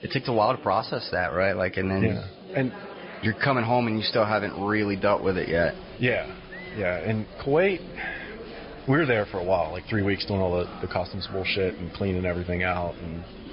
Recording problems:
high frequencies cut off; noticeable; nothing above 5 kHz
garbled, watery; slightly
murmuring crowd; noticeable; throughout; 15 dB below the speech

